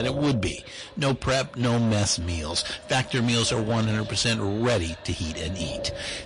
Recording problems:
distortion; heavy; 13% of the sound clipped
echo of what is said; faint; throughout; 580 ms later, 20 dB below the speech
garbled, watery; slightly; nothing above 10.5 kHz
wind noise on the microphone; occasional gusts; 15 dB below the speech
abrupt cut into speech; at the start

